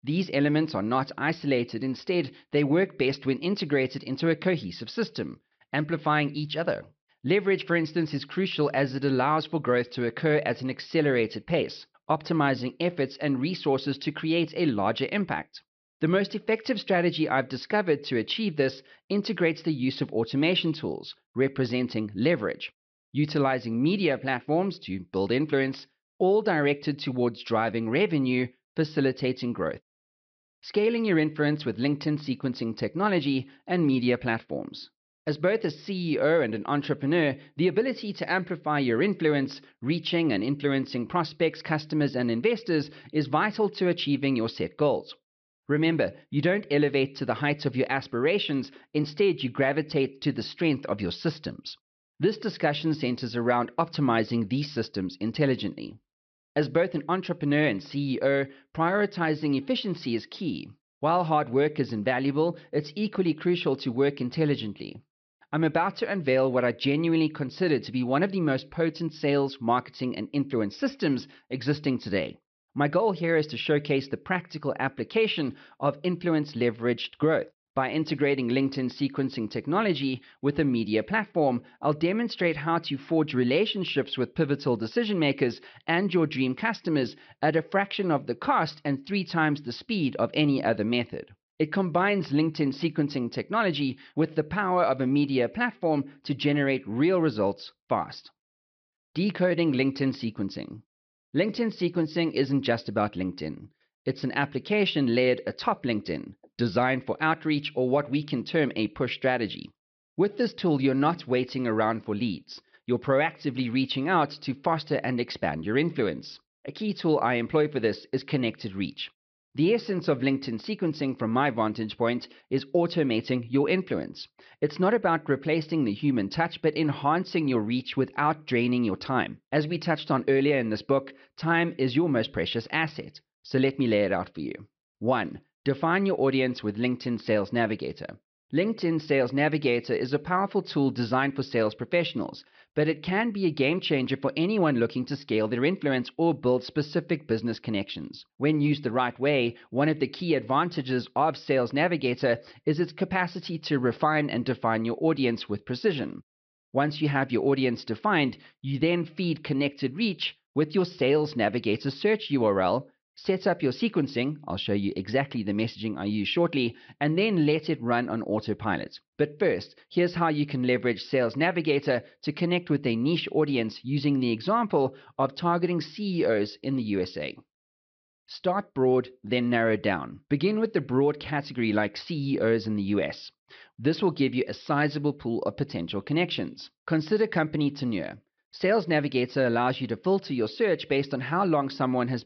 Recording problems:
high frequencies cut off; noticeable; nothing above 5.5 kHz

